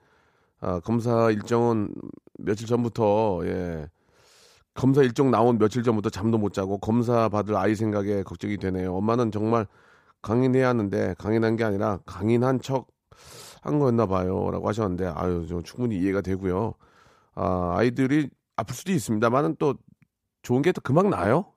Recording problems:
none

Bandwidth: 15 kHz